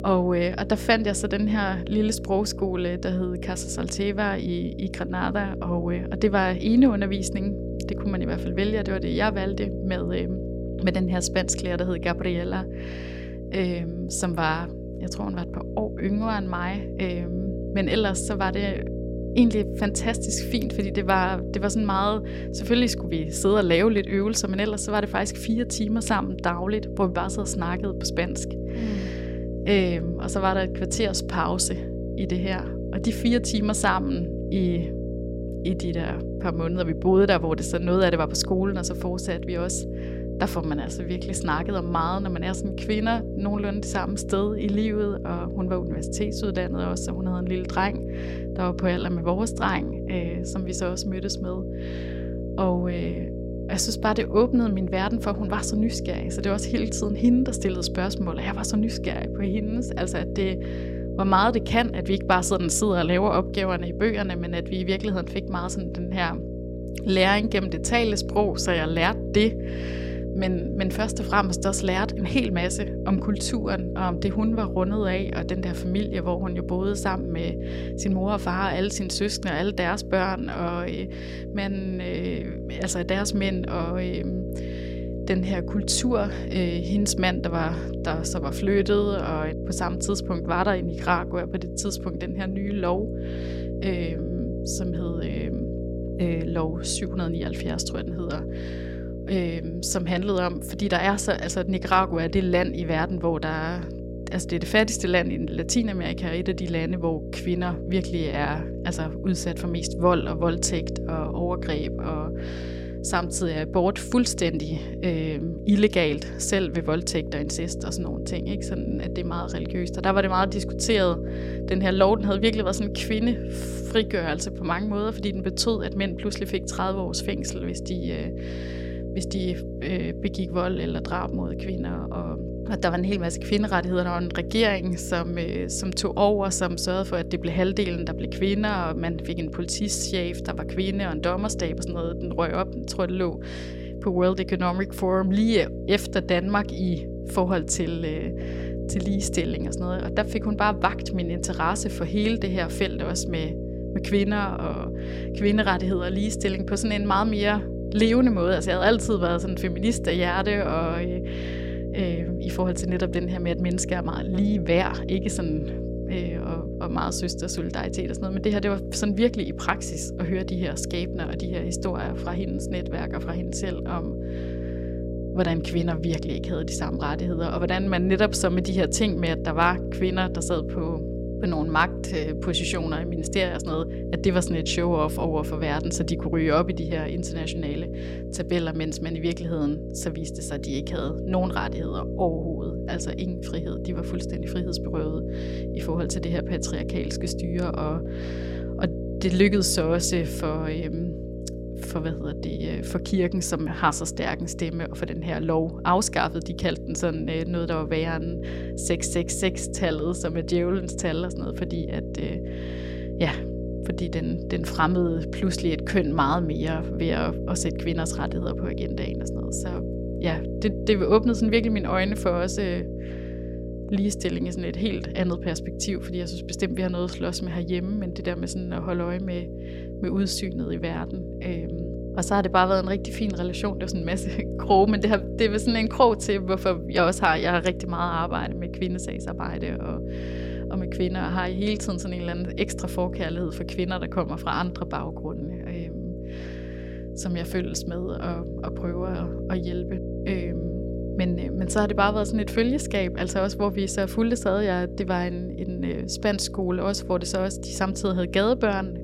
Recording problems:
electrical hum; loud; throughout; 60 Hz, 10 dB below the speech

